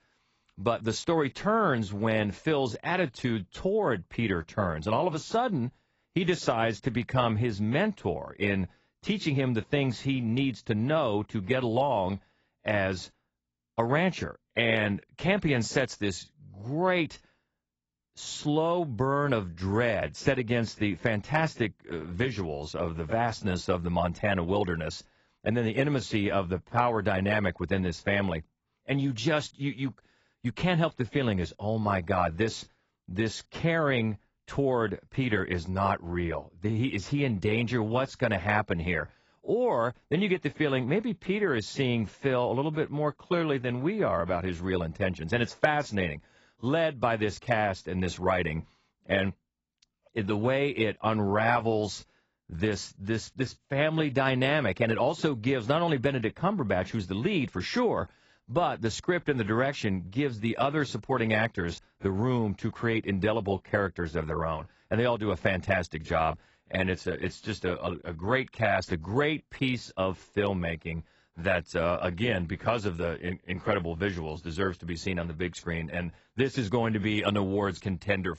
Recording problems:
garbled, watery; badly; nothing above 7.5 kHz

